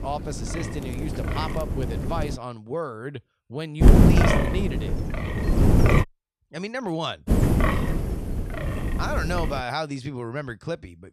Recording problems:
wind noise on the microphone; heavy; until 2.5 s, from 4 to 6 s and from 7.5 to 9.5 s; 3 dB above the speech

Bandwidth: 13.5 kHz